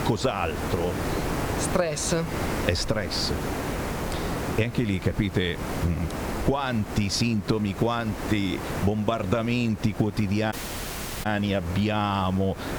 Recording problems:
squashed, flat; heavily
hiss; loud; throughout; 6 dB below the speech
audio cutting out; at 11 s for 0.5 s

